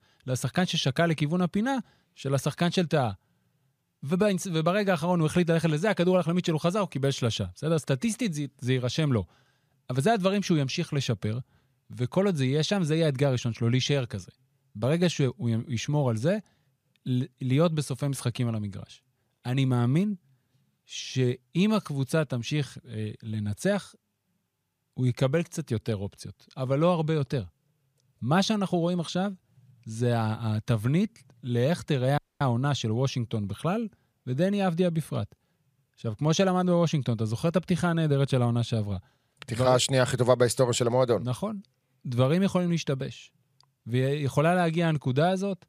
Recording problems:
audio cutting out; at 32 s

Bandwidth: 15 kHz